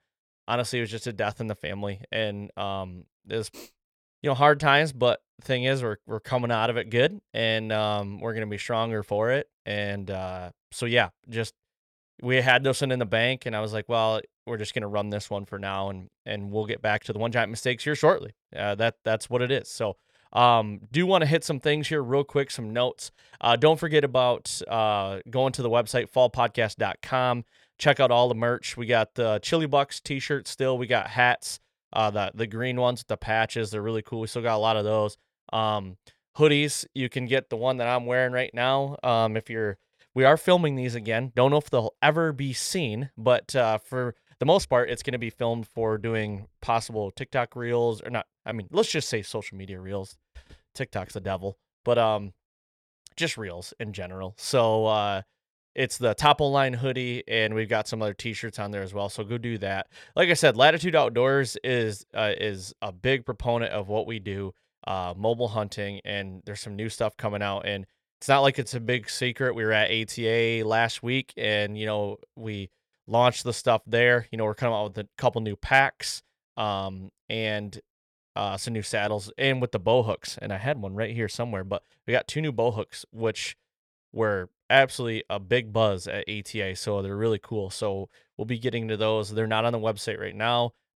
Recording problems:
uneven, jittery; strongly; from 14 s to 1:15

